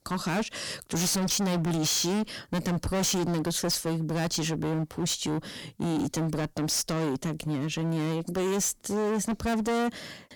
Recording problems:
distortion; heavy; 28% of the sound clipped

